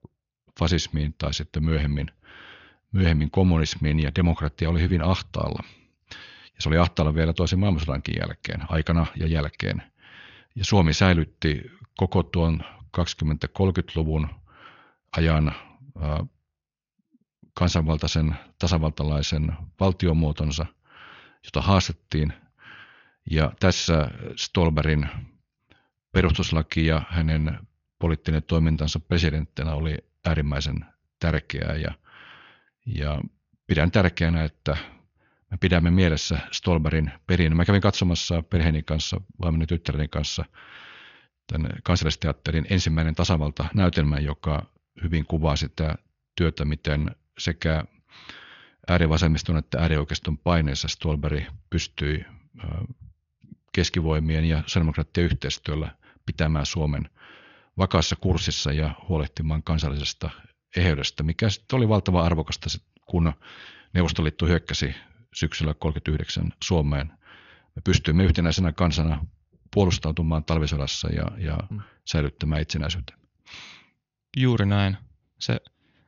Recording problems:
high frequencies cut off; noticeable; nothing above 7 kHz

